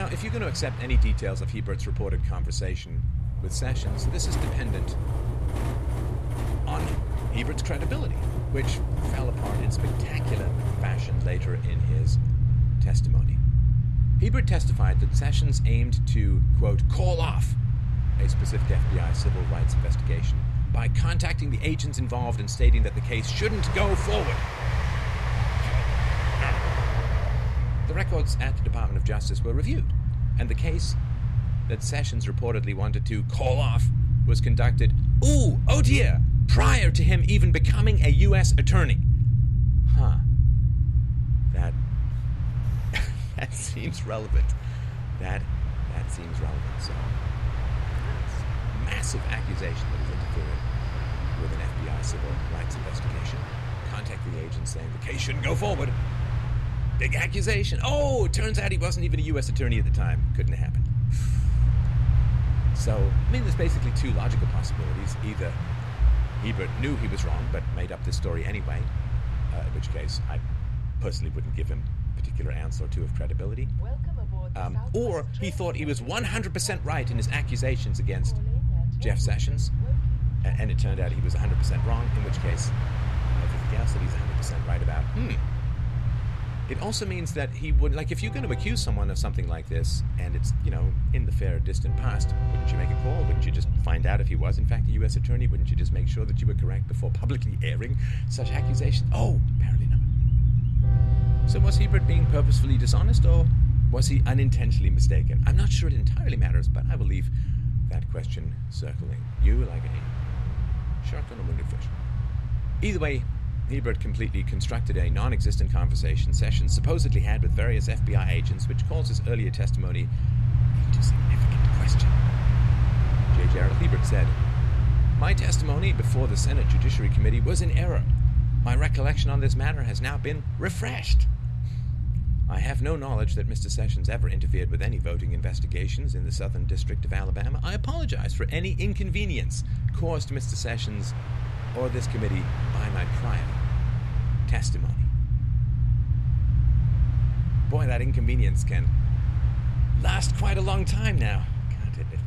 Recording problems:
train or aircraft noise; loud; throughout; 8 dB below the speech
low rumble; loud; throughout; 6 dB below the speech
abrupt cut into speech; at the start

